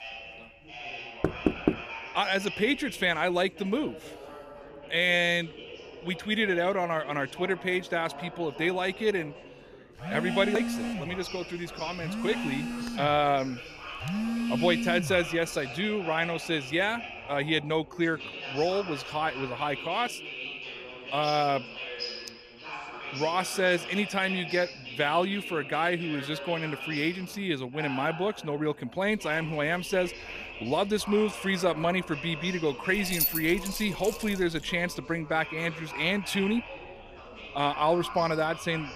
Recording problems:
background chatter; noticeable; throughout; 4 voices, 10 dB below the speech
door banging; loud; at 1 s; peak 1 dB above the speech
phone ringing; noticeable; from 10 to 15 s; peak 1 dB below the speech
jangling keys; loud; from 33 to 35 s; peak 2 dB above the speech

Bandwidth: 14.5 kHz